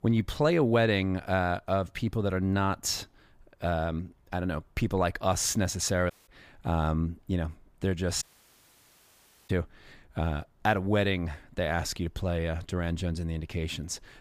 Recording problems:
audio cutting out; at 6 s and at 8 s for 1.5 s

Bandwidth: 15 kHz